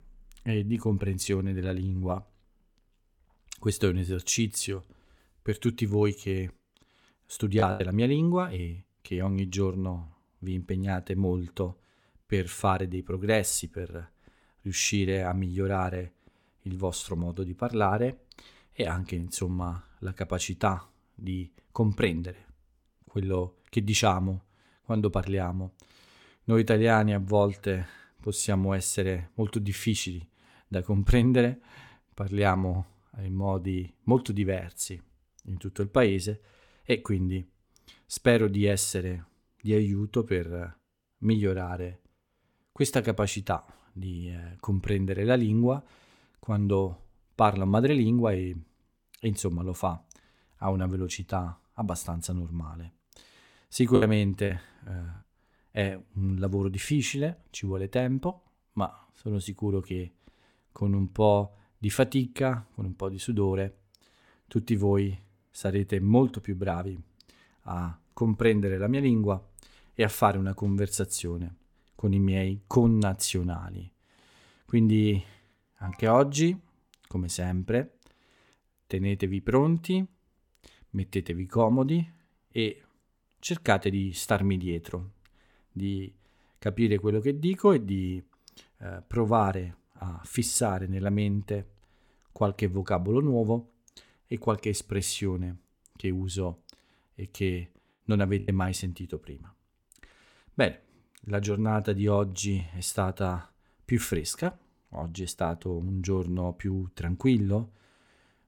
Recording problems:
choppy; very; at 7.5 s, at 54 s and at 1:38; 5% of the speech affected

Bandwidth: 17.5 kHz